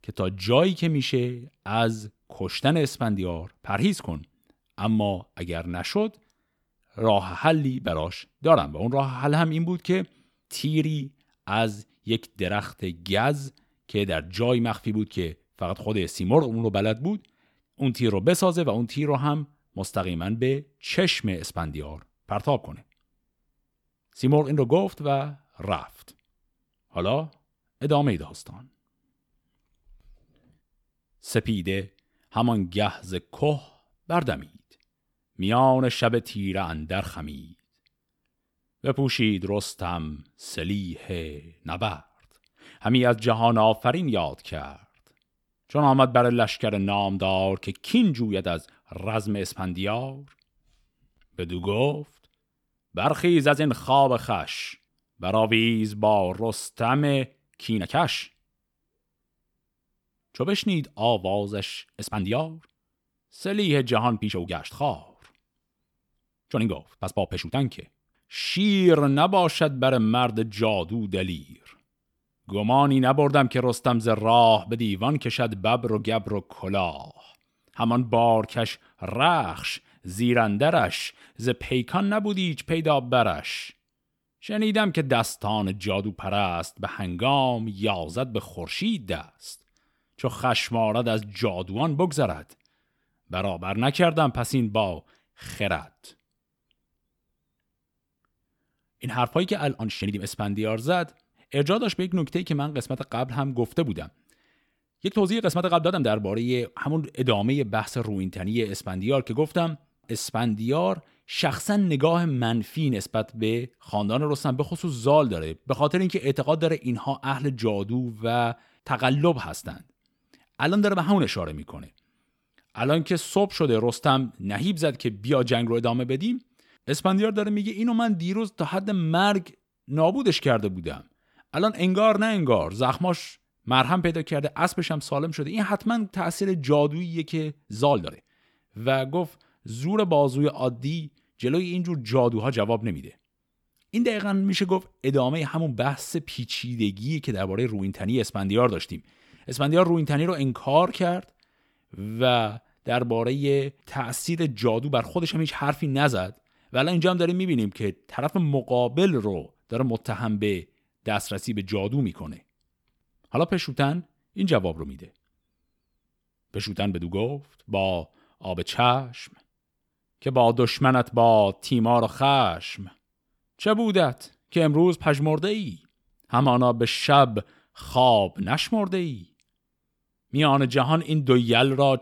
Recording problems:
uneven, jittery; strongly; from 44 s to 2:55

